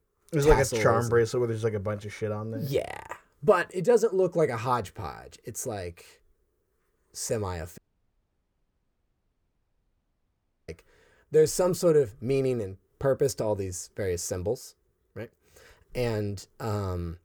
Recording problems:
audio cutting out; at 8 s for 3 s

